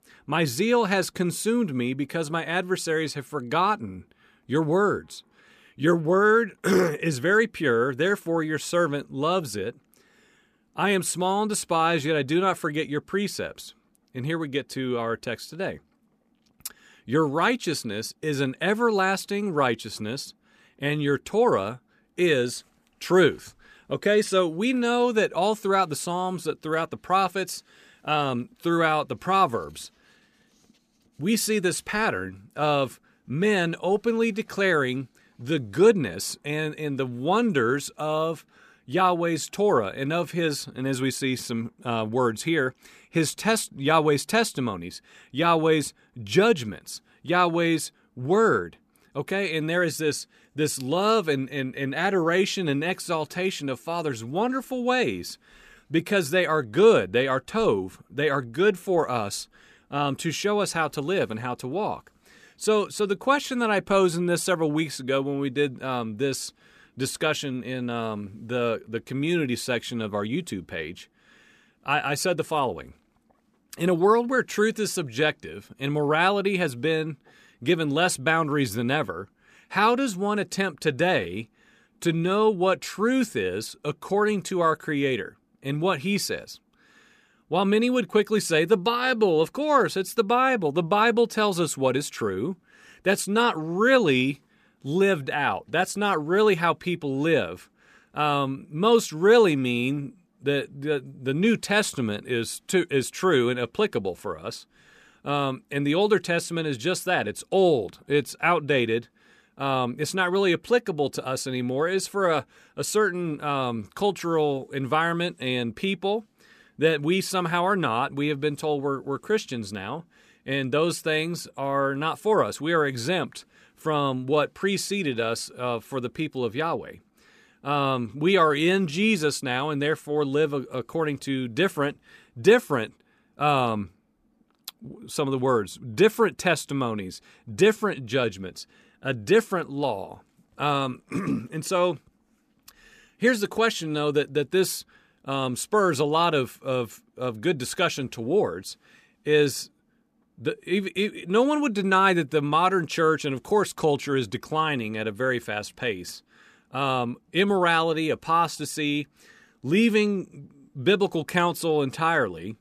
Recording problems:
none

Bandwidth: 14.5 kHz